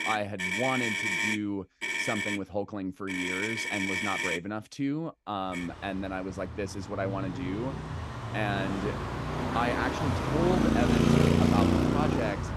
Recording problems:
traffic noise; very loud; throughout; 5 dB above the speech

